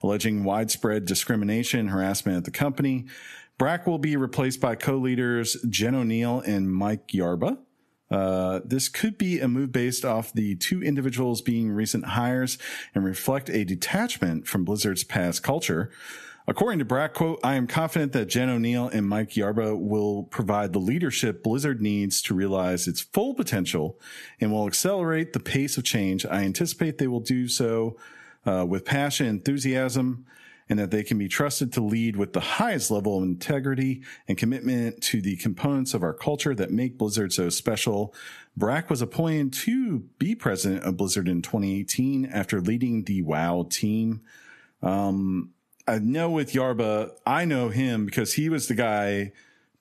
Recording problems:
squashed, flat; somewhat

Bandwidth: 13.5 kHz